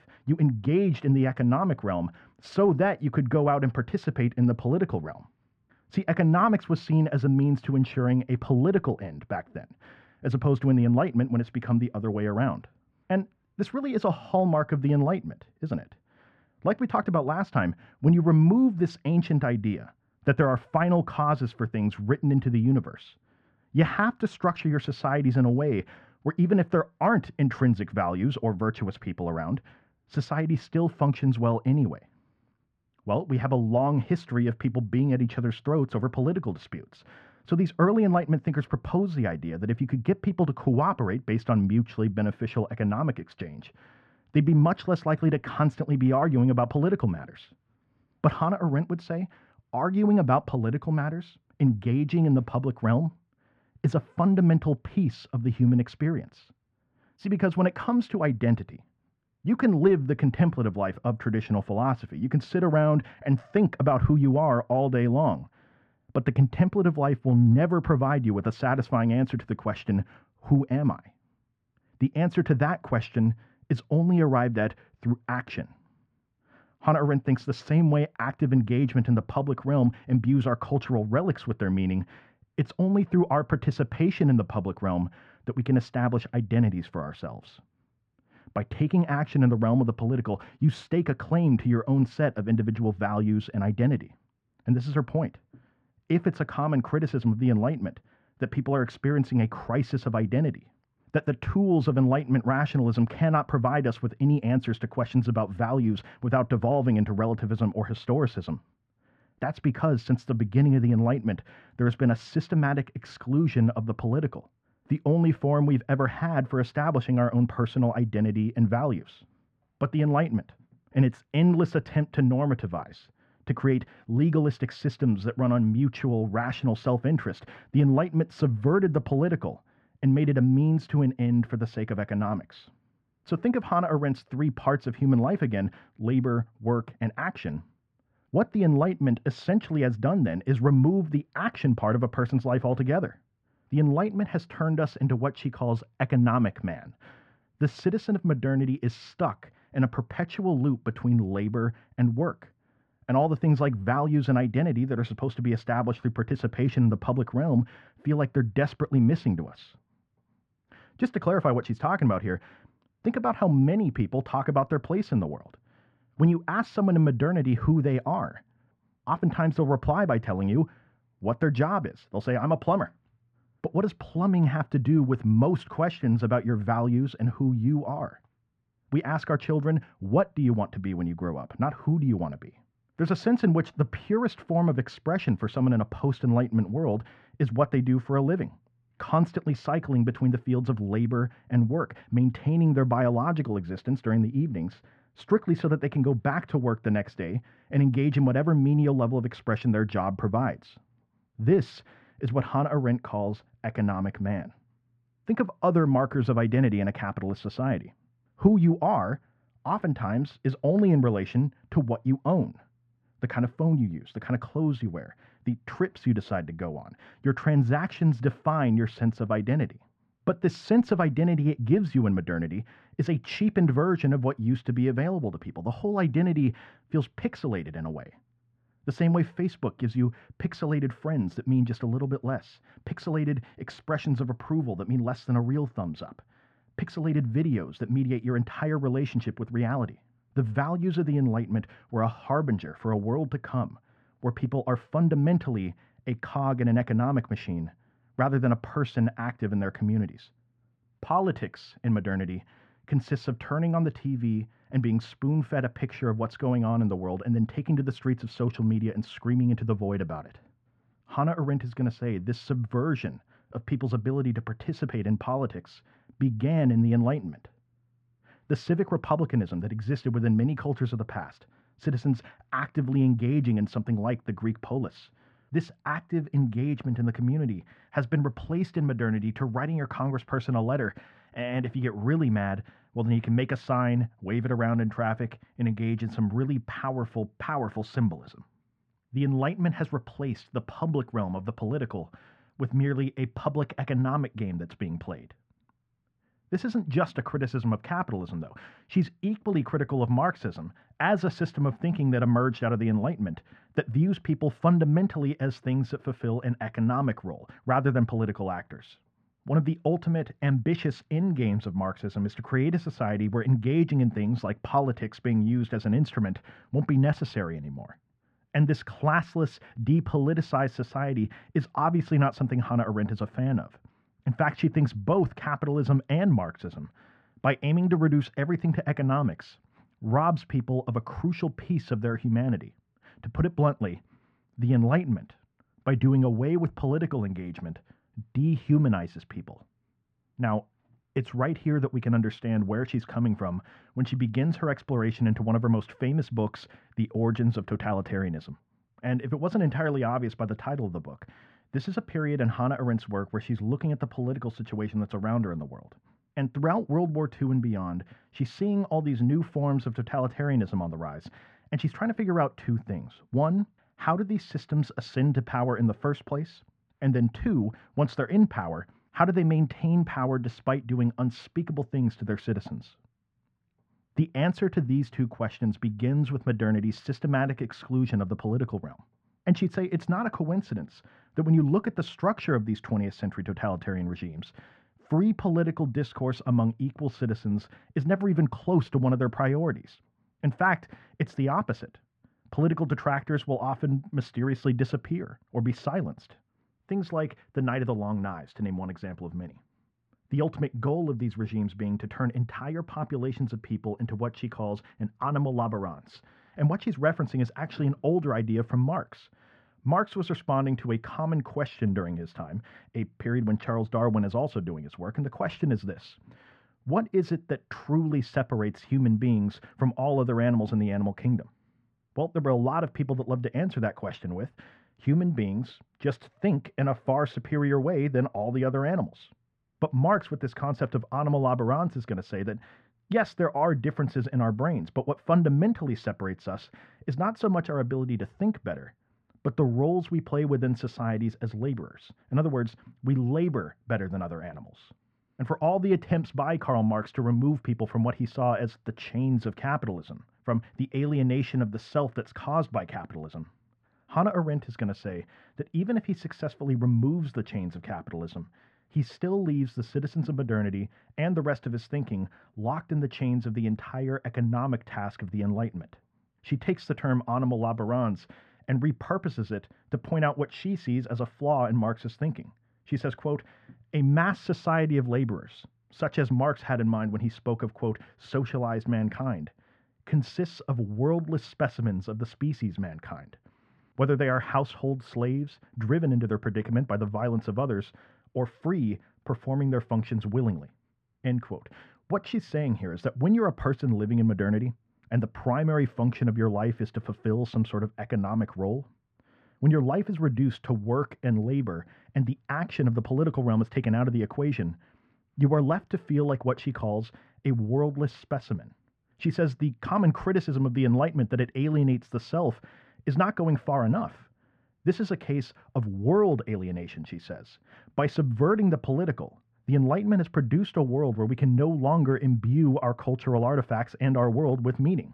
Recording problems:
muffled; very; fading above 1.5 kHz

